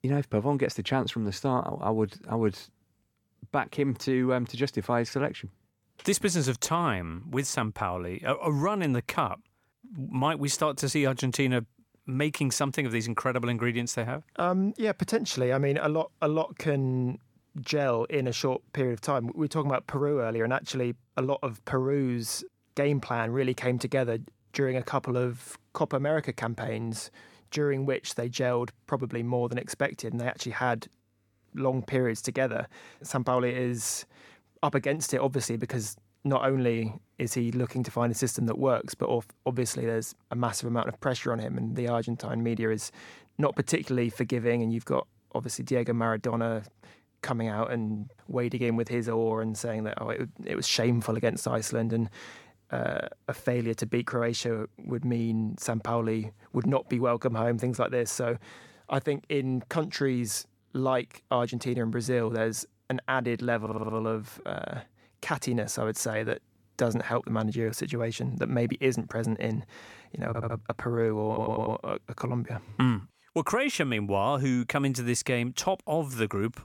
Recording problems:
audio stuttering; at 1:04, at 1:10 and at 1:11

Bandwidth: 18 kHz